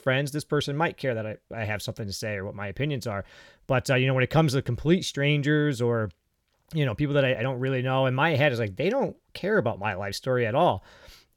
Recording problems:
none

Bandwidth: 17.5 kHz